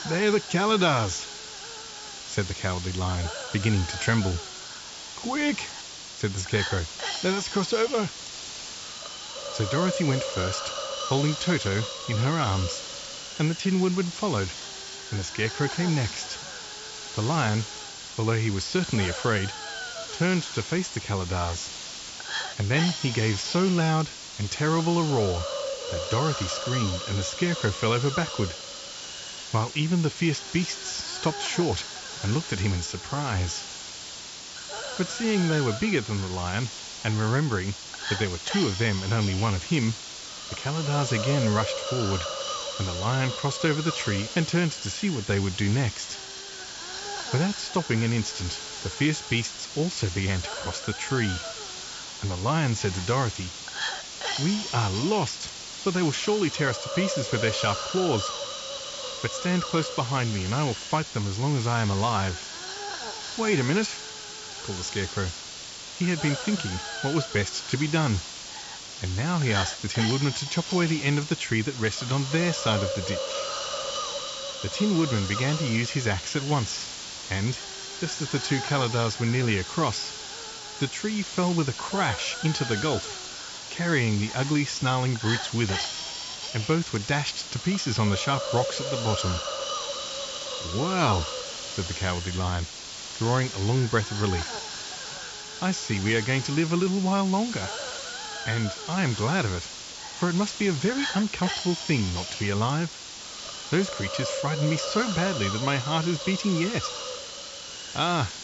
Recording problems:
high frequencies cut off; noticeable; nothing above 8 kHz
hiss; loud; throughout; 6 dB below the speech

